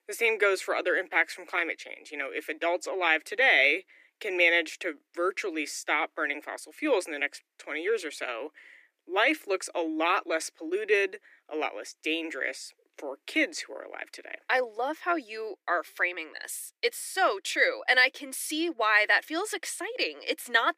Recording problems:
thin; very; fading below 300 Hz

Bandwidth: 15 kHz